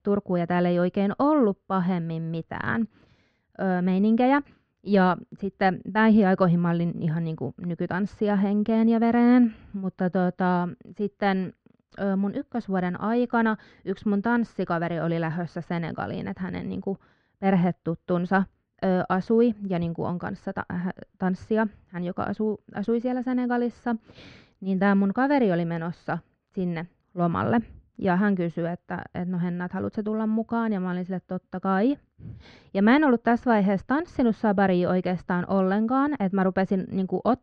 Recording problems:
muffled; very; fading above 2 kHz

